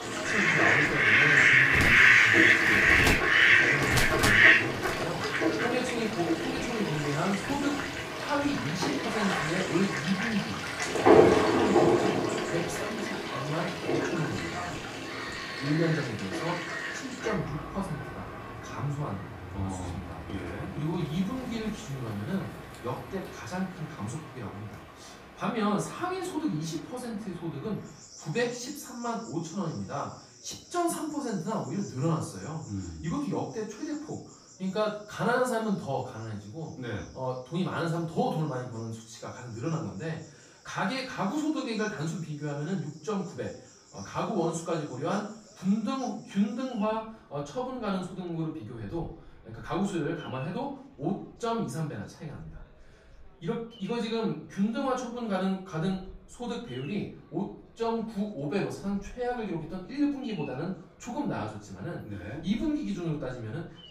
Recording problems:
off-mic speech; far
room echo; noticeable; dies away in 0.4 s
animal sounds; very loud; throughout; 9 dB above the speech
chatter from many people; faint; throughout; 30 dB below the speech

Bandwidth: 15 kHz